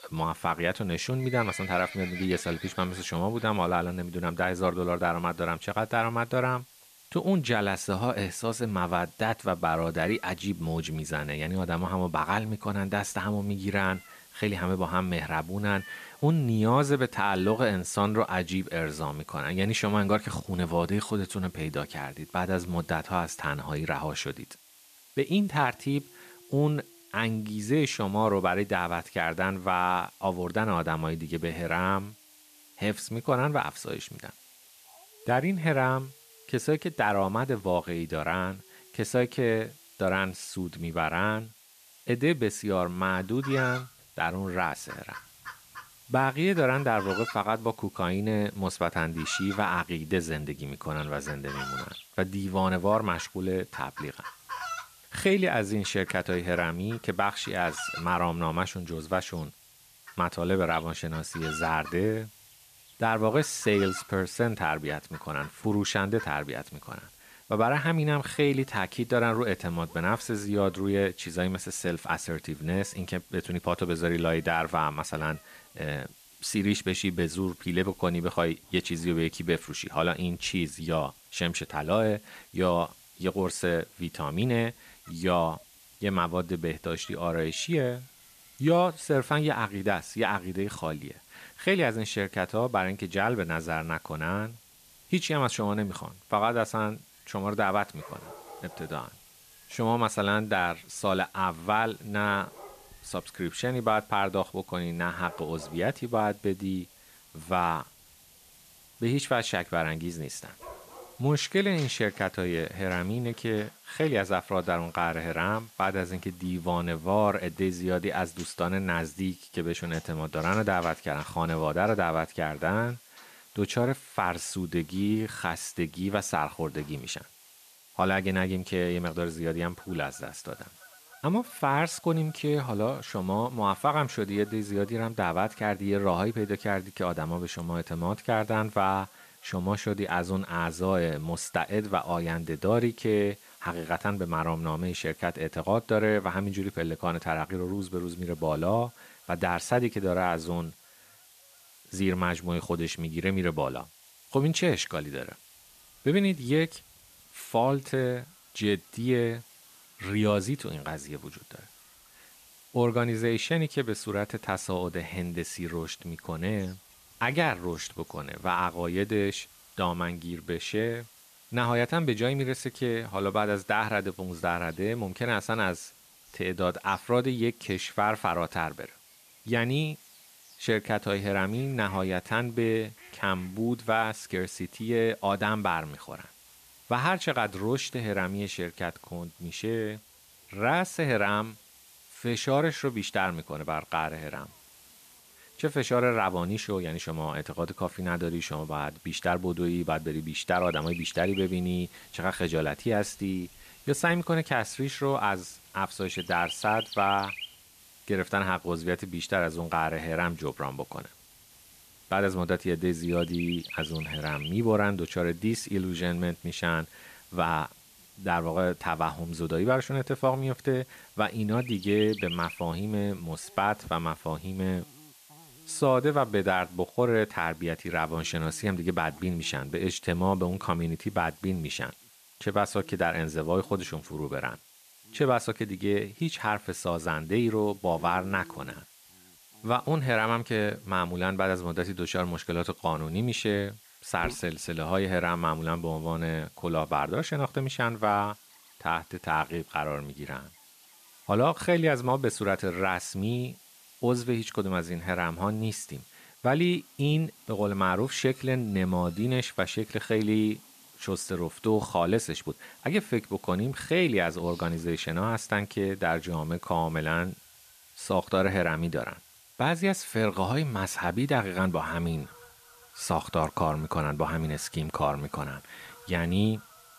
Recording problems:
animal sounds; noticeable; throughout; 15 dB below the speech
hiss; faint; throughout; 25 dB below the speech

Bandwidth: 14.5 kHz